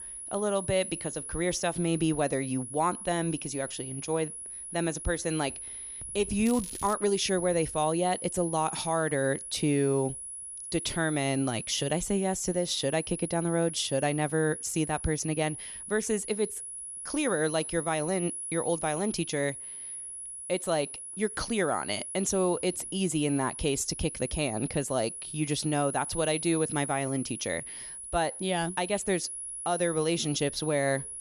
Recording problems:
high-pitched whine; loud; throughout; 10.5 kHz, 7 dB below the speech
crackling; noticeable; at 6.5 s; 15 dB below the speech

